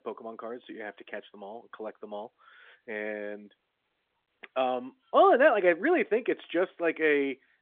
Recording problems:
phone-call audio; nothing above 3.5 kHz

